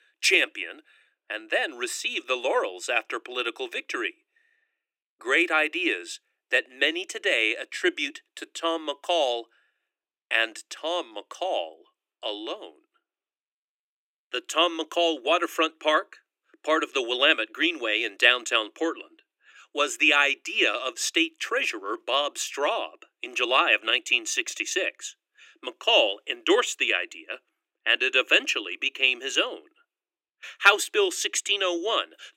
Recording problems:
thin; very; fading below 300 Hz

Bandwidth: 16 kHz